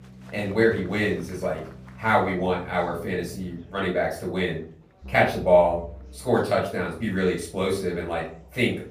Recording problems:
off-mic speech; far
room echo; slight; dies away in 0.4 s
background music; faint; throughout; 20 dB below the speech
murmuring crowd; faint; throughout; 30 dB below the speech

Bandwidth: 15 kHz